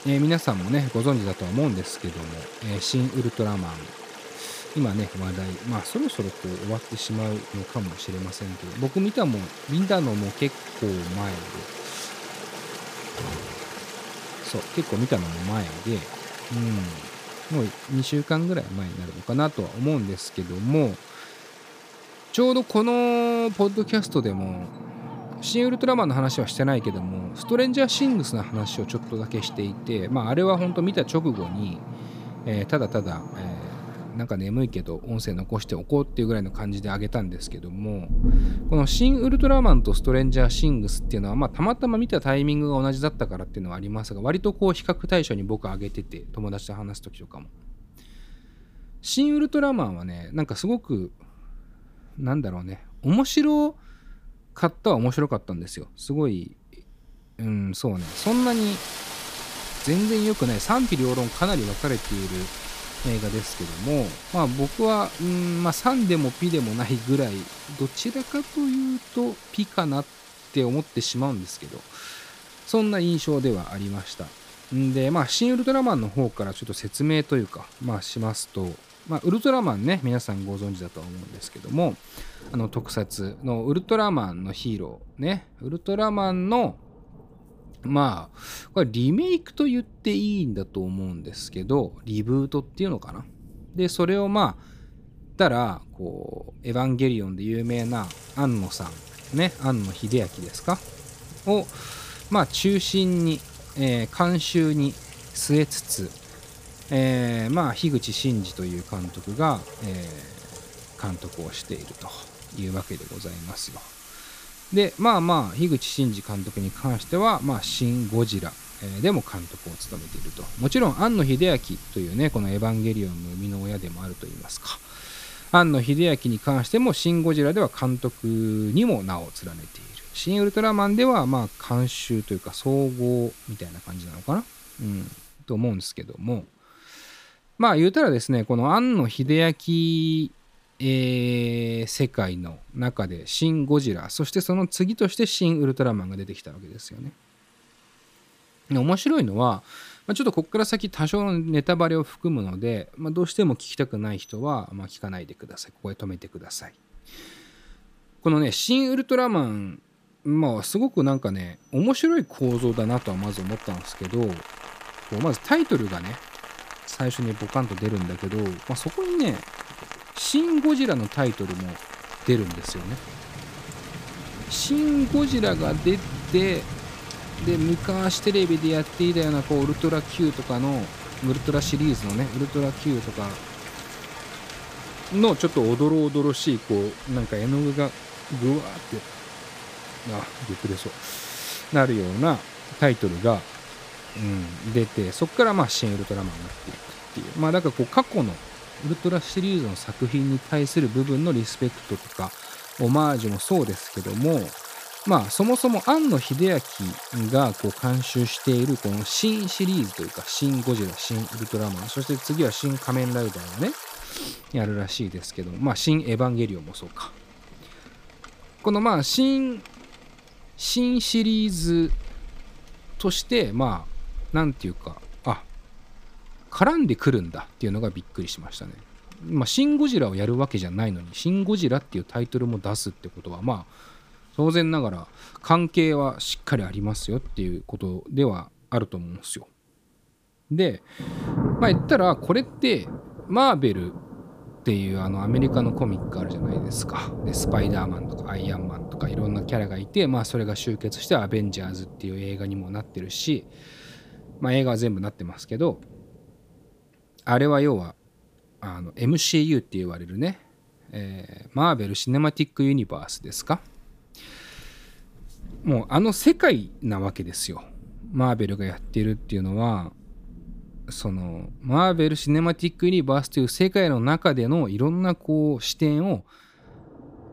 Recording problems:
rain or running water; noticeable; throughout; 10 dB below the speech

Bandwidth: 15 kHz